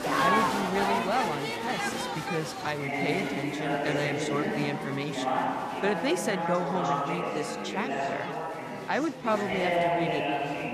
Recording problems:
chatter from many people; very loud; throughout; 2 dB above the speech

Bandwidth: 14.5 kHz